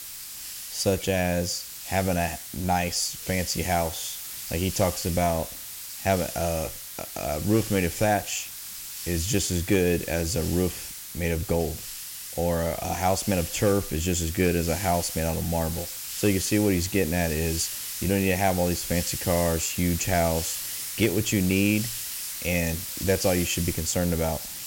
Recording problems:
hiss; loud; throughout; 7 dB below the speech

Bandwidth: 16.5 kHz